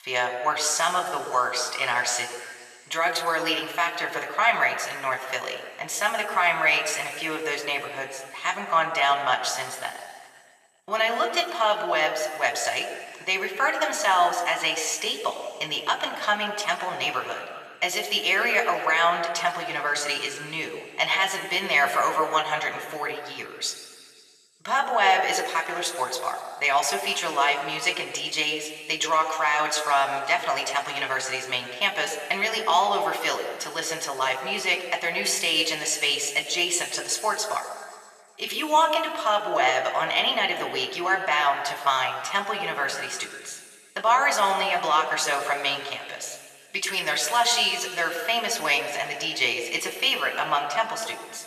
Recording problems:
thin; very; fading below 600 Hz
room echo; noticeable; dies away in 1.9 s
off-mic speech; somewhat distant

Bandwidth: 14 kHz